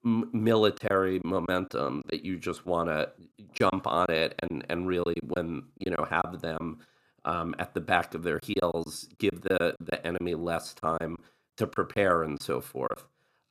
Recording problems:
choppy; very; from 1 to 2 s, from 3.5 to 6.5 s and from 8.5 to 13 s; 9% of the speech affected

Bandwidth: 14.5 kHz